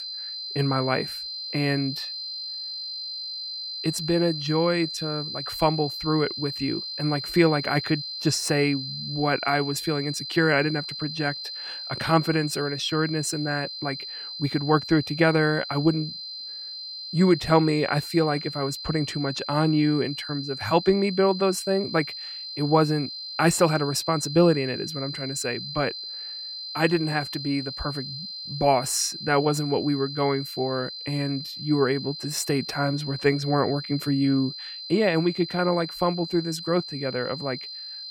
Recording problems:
high-pitched whine; loud; throughout; 4 kHz, 8 dB below the speech

